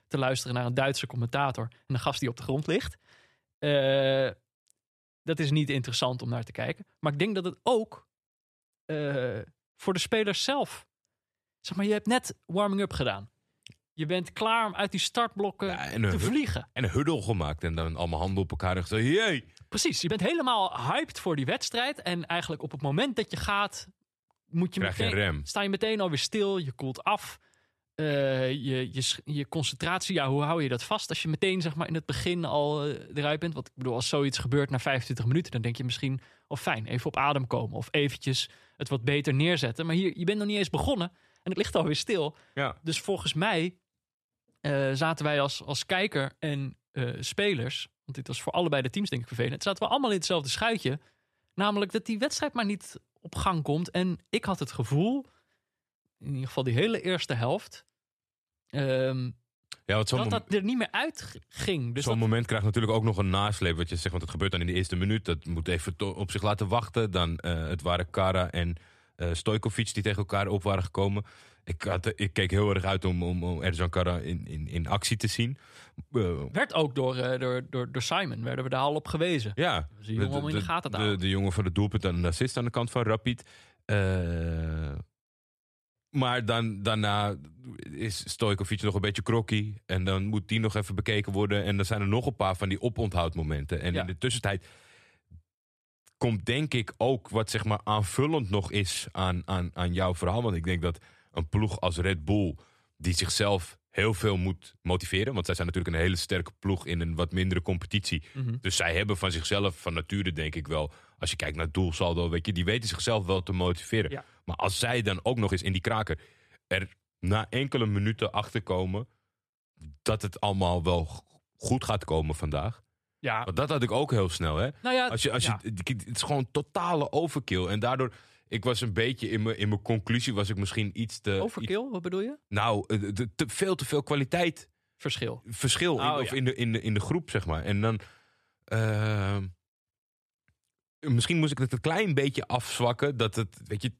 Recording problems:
uneven, jittery; strongly; from 2 s to 2:22

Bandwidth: 13.5 kHz